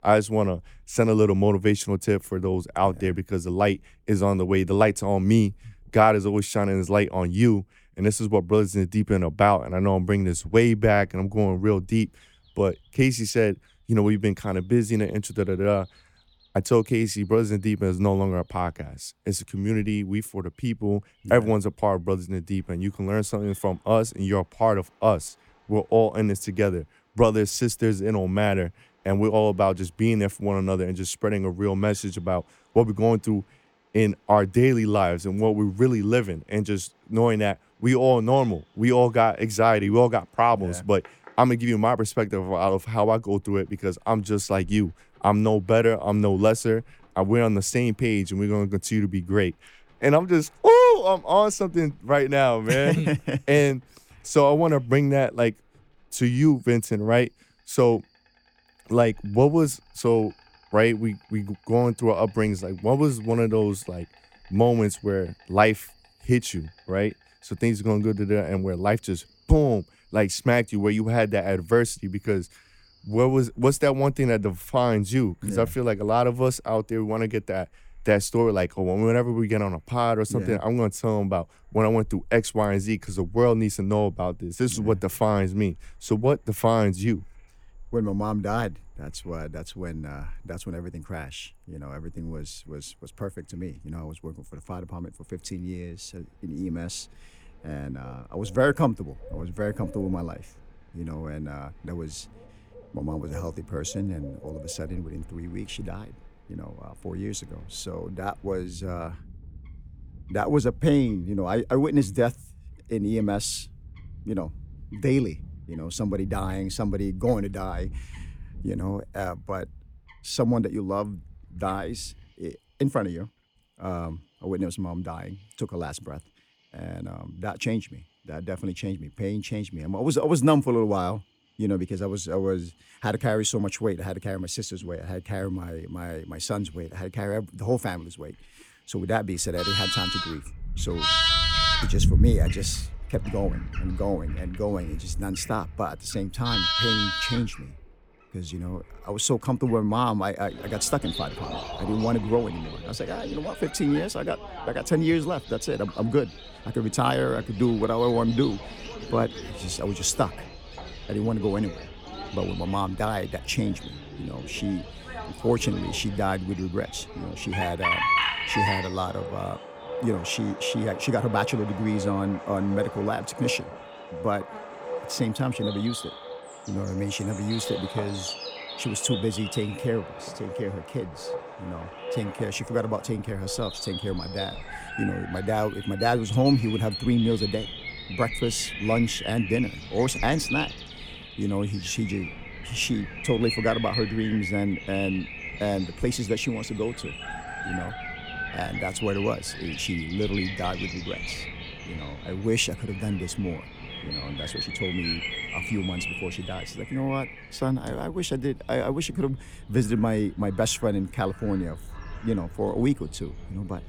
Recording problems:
animal sounds; loud; throughout; 8 dB below the speech

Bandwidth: 18 kHz